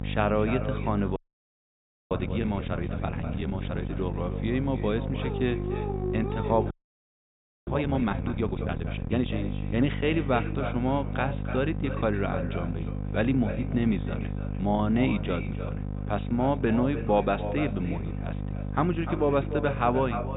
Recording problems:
echo of what is said; strong; throughout; 300 ms later, 10 dB below the speech
high frequencies cut off; severe; nothing above 4 kHz
electrical hum; noticeable; throughout; 50 Hz, 10 dB below the speech
audio freezing; at 1 s for 1 s and at 6.5 s for 1 s
dog barking; noticeable; from 5 to 8 s; peak 4 dB below the speech

